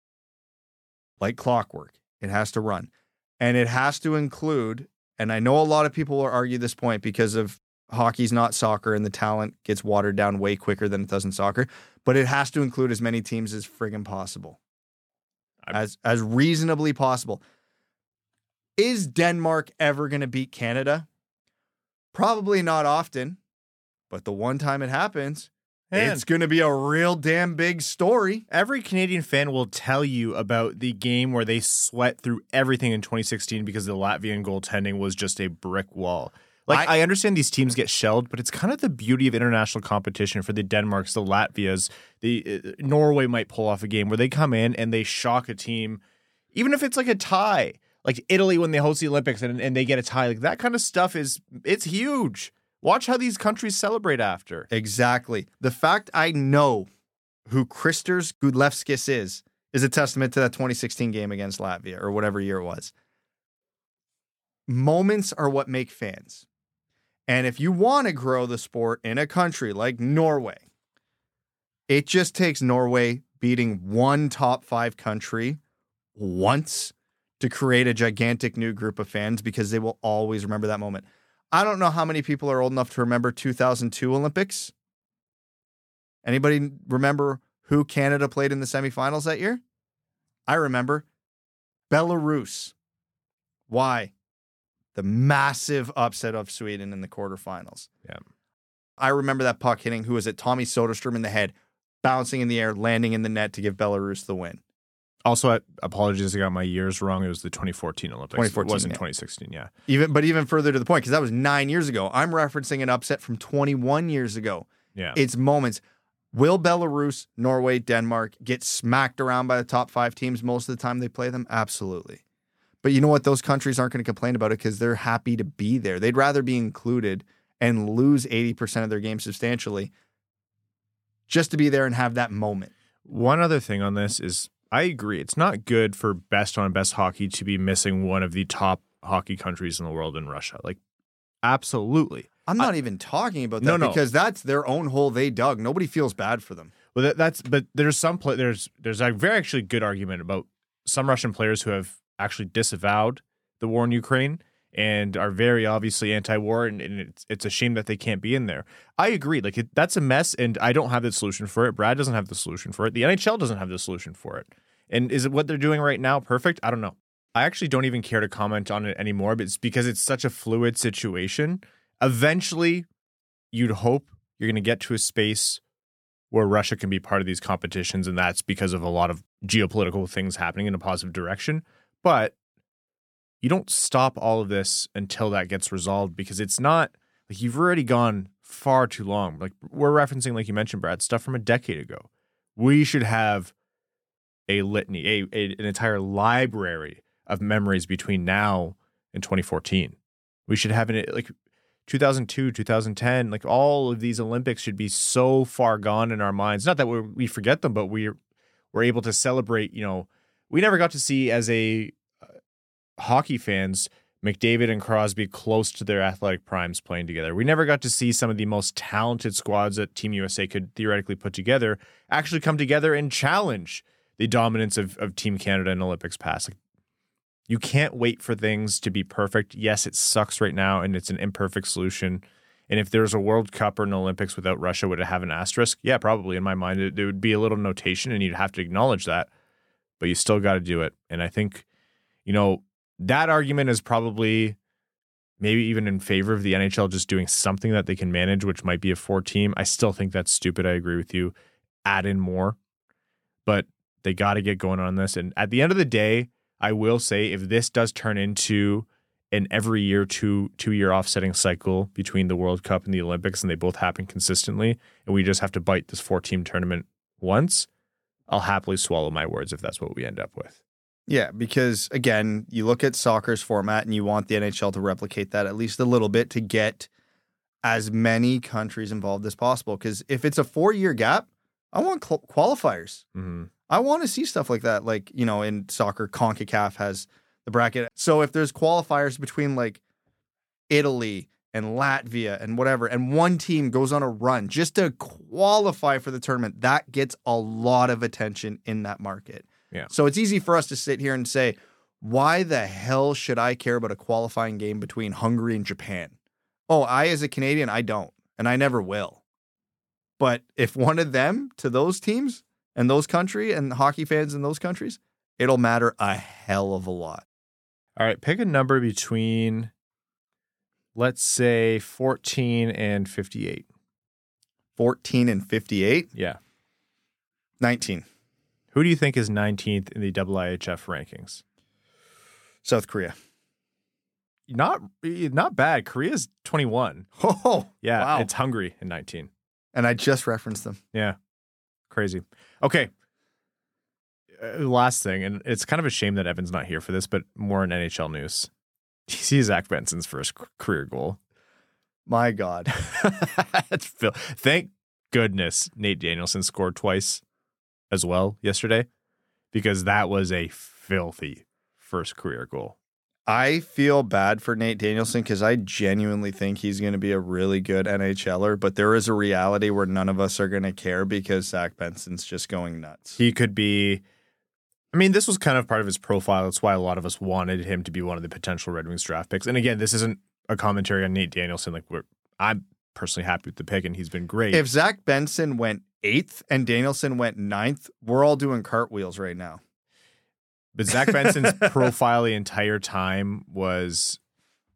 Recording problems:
none

